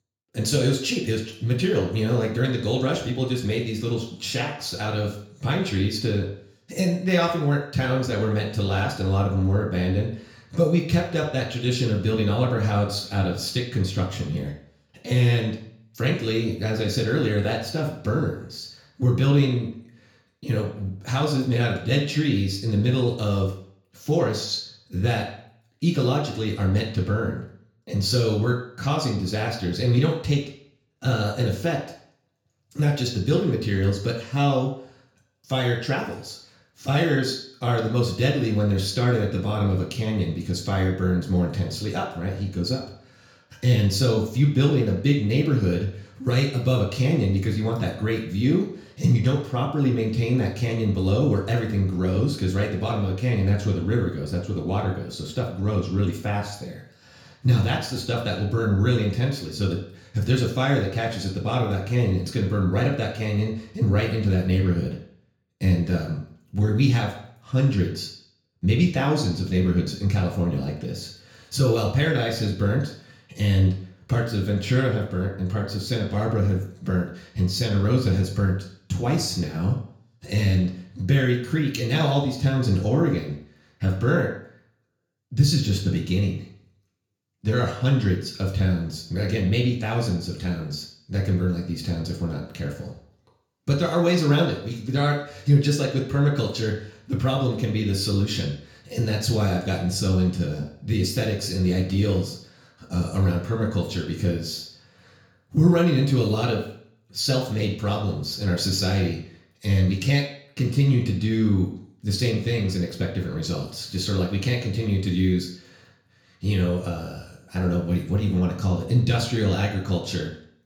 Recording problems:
off-mic speech; far
room echo; slight; dies away in 0.5 s

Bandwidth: 18.5 kHz